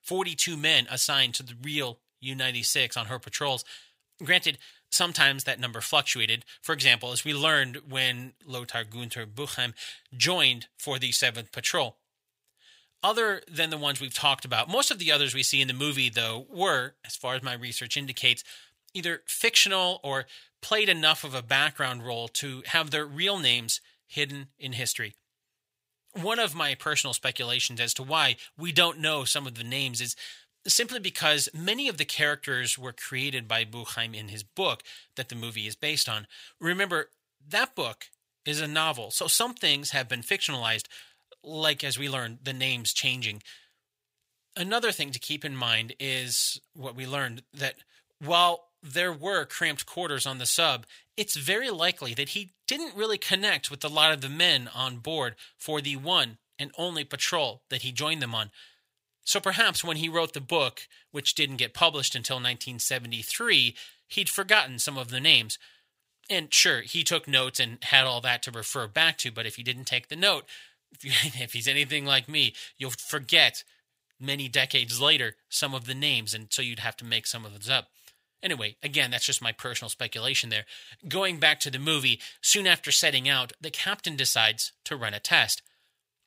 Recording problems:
thin; somewhat; fading below 700 Hz

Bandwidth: 15.5 kHz